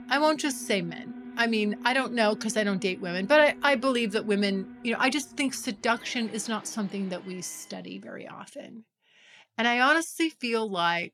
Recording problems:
alarms or sirens; noticeable; until 7.5 s; 20 dB below the speech

